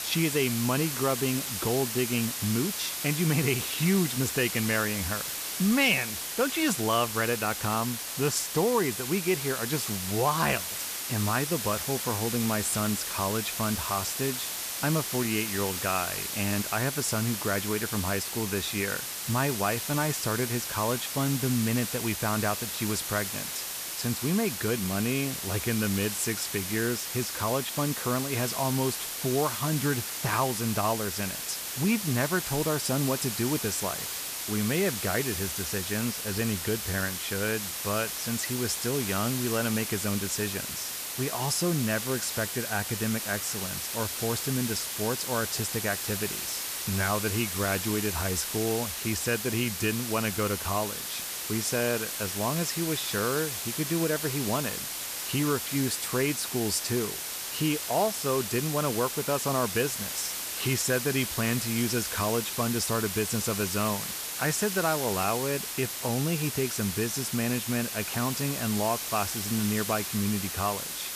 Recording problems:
hiss; loud; throughout; 2 dB below the speech

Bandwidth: 14.5 kHz